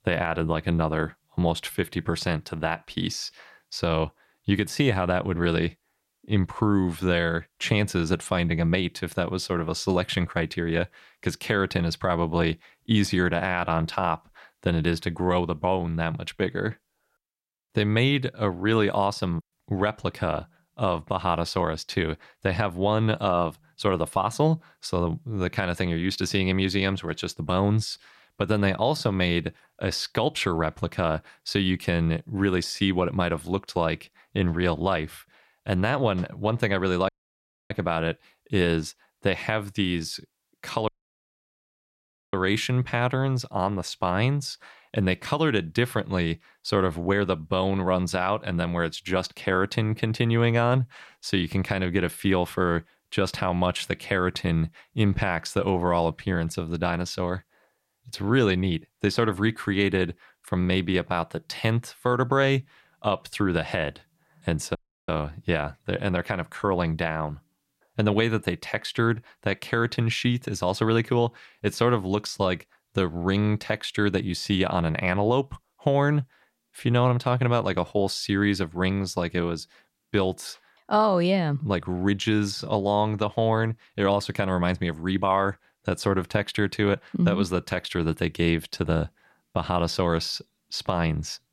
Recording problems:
audio cutting out; at 37 s for 0.5 s, at 41 s for 1.5 s and at 1:05

